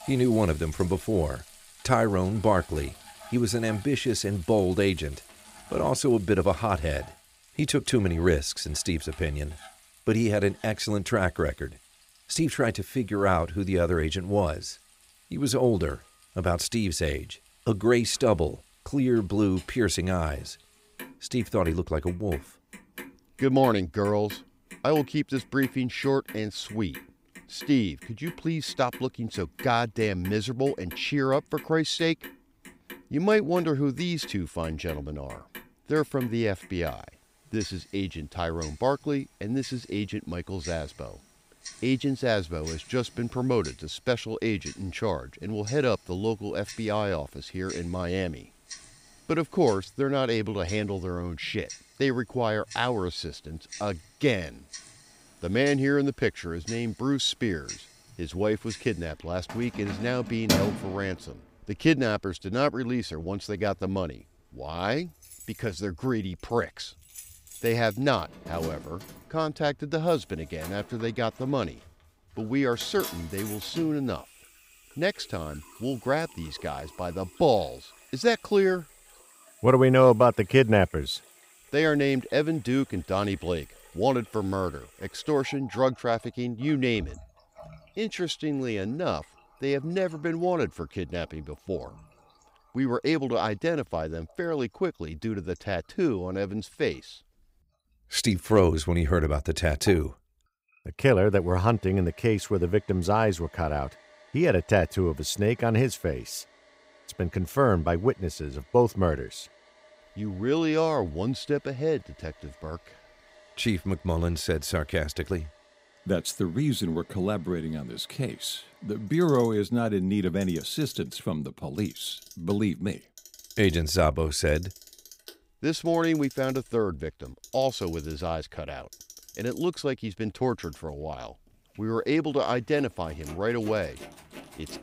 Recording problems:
household noises; noticeable; throughout; 15 dB below the speech

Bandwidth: 15.5 kHz